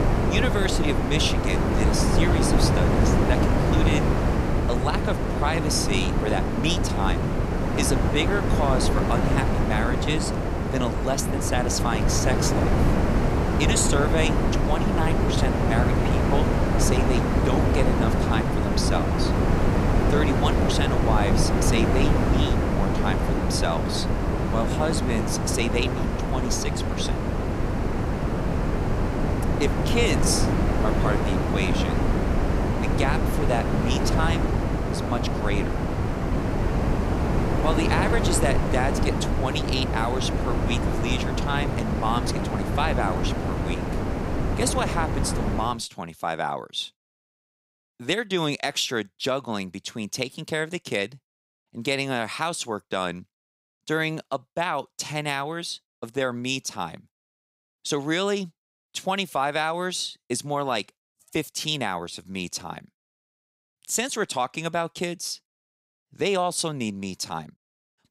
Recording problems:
wind noise on the microphone; heavy; until 46 s; as loud as the speech

